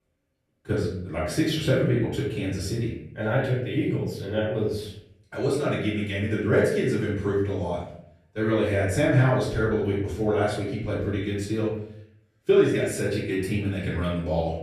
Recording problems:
off-mic speech; far
room echo; noticeable; dies away in 0.6 s

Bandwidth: 13.5 kHz